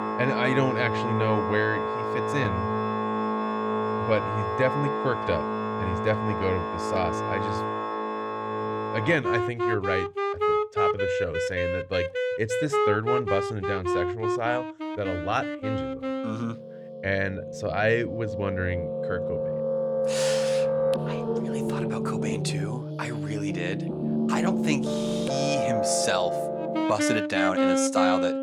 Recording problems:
background music; very loud; throughout; 2 dB above the speech

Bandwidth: 18 kHz